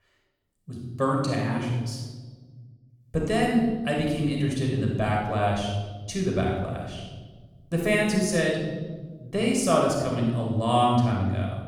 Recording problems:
room echo; noticeable; dies away in 1.3 s
off-mic speech; somewhat distant

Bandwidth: 18.5 kHz